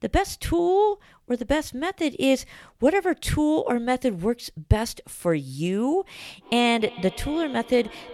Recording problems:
echo of what is said; noticeable; from 6.5 s on; 280 ms later, 20 dB below the speech

